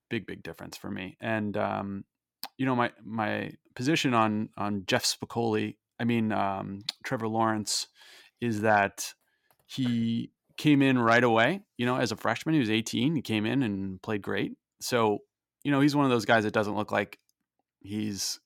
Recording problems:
none

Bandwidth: 17 kHz